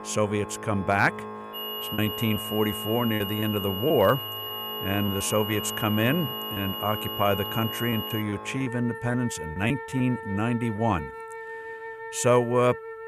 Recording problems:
high-pitched whine; loud; from 1.5 to 8 s; 3 kHz, 6 dB below the speech
background music; noticeable; throughout; 10 dB below the speech
choppy; very; from 2 to 5.5 s and from 6.5 to 11 s; 7% of the speech affected

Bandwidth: 14.5 kHz